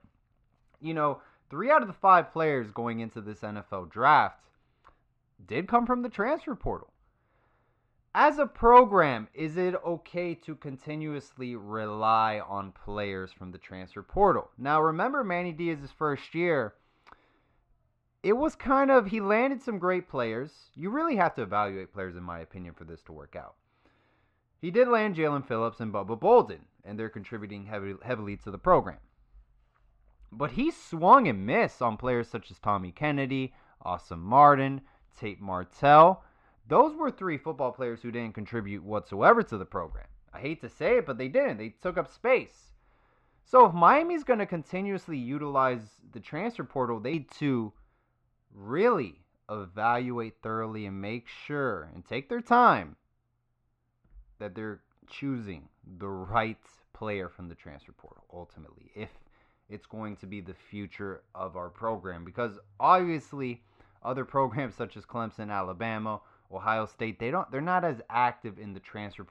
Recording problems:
muffled; very; fading above 2 kHz

